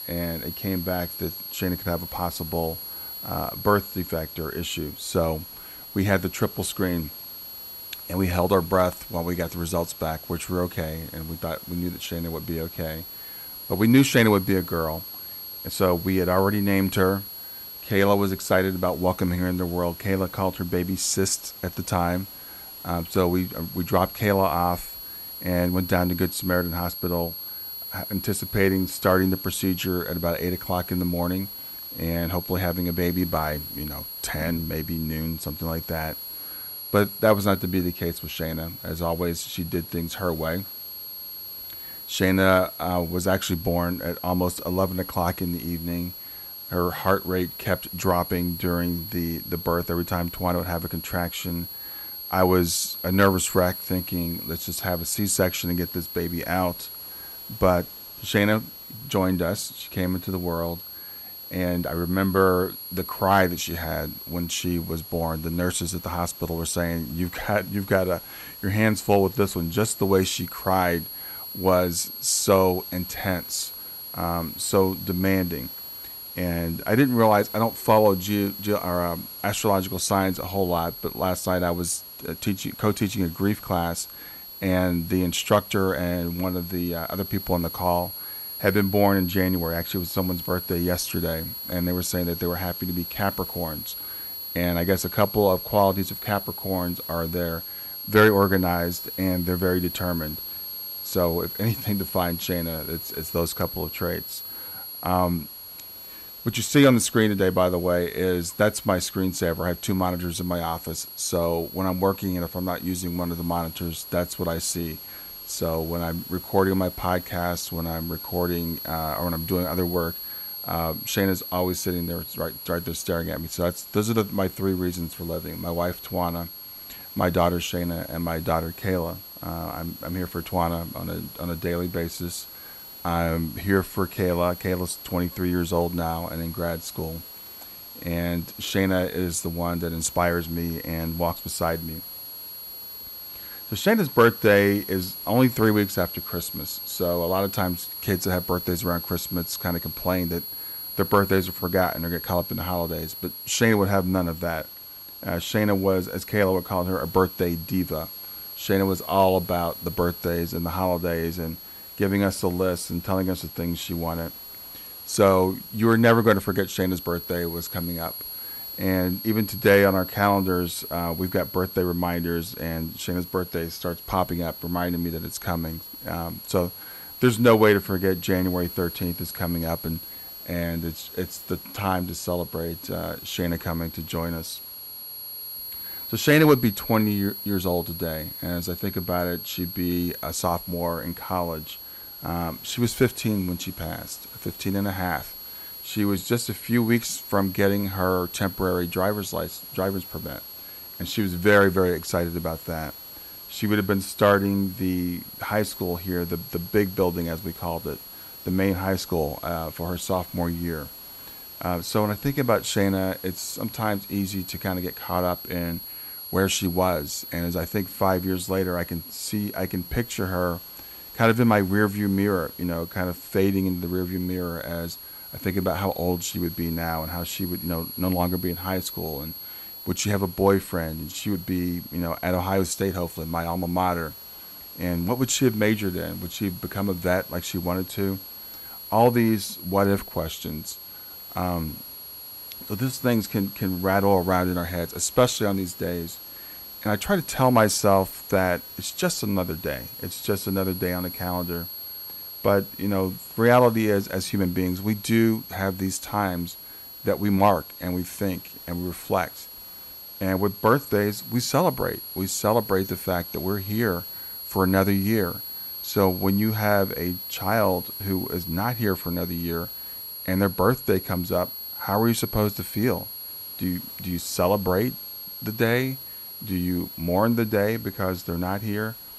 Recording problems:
high-pitched whine; noticeable; throughout; 11.5 kHz, 10 dB below the speech
hiss; faint; throughout; 25 dB below the speech

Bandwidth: 15.5 kHz